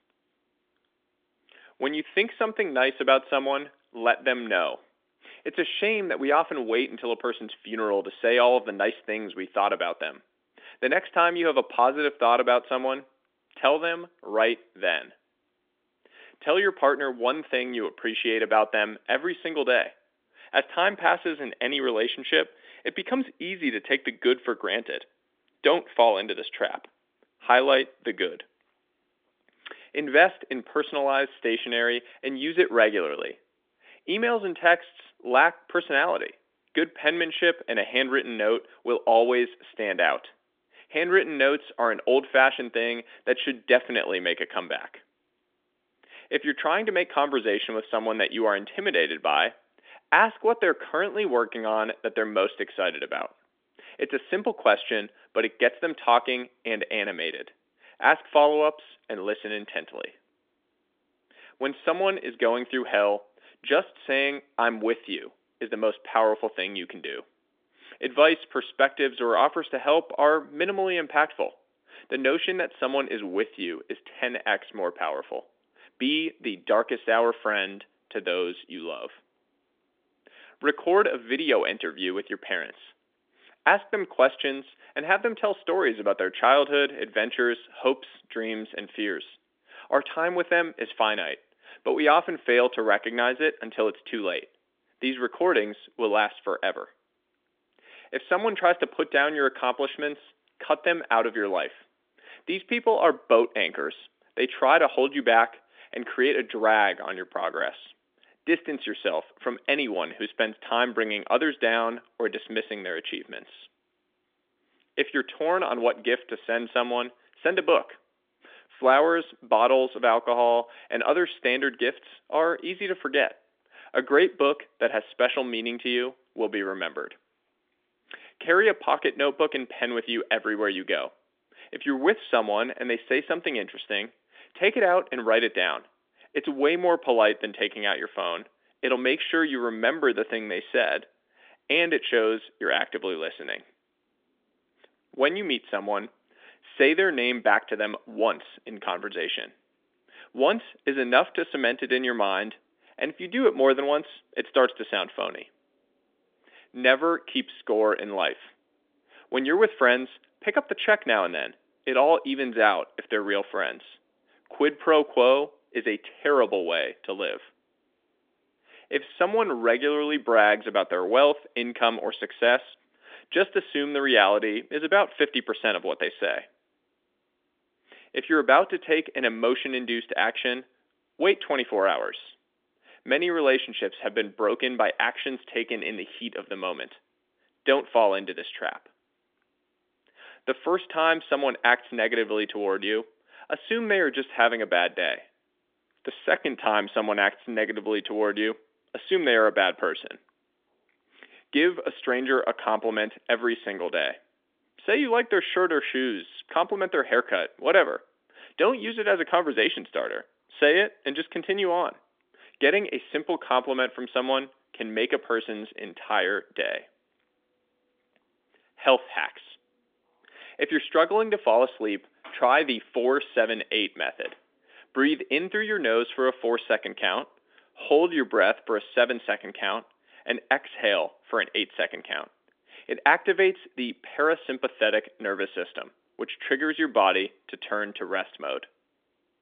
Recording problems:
phone-call audio; nothing above 3.5 kHz

